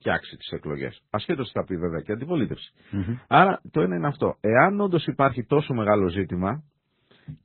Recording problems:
garbled, watery; badly; nothing above 4 kHz

